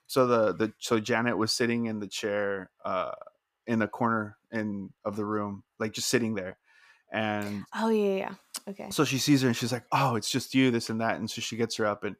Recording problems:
none

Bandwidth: 15 kHz